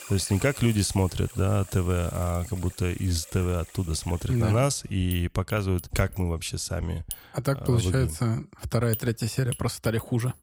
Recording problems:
household noises; noticeable; throughout; 15 dB below the speech

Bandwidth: 17 kHz